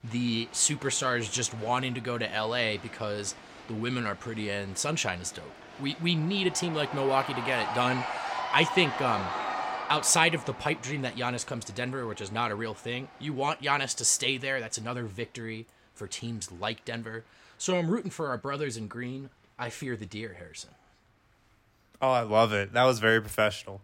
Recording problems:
crowd noise; loud; throughout; 9 dB below the speech

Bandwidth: 16.5 kHz